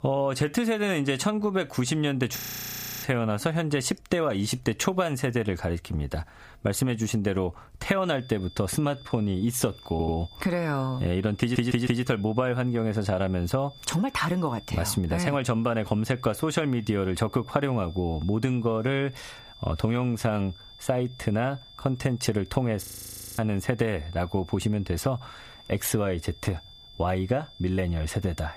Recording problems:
squashed, flat; somewhat
high-pitched whine; faint; from 8 s on; 3.5 kHz, 25 dB below the speech
audio freezing; at 2.5 s for 0.5 s and at 23 s for 0.5 s
audio stuttering; at 10 s and at 11 s

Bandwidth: 15 kHz